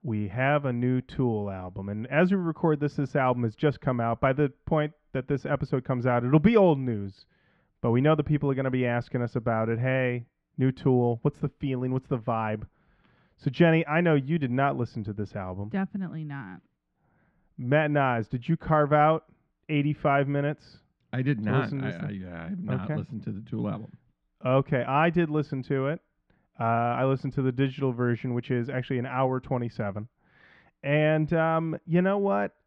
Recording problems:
muffled; very; fading above 2 kHz

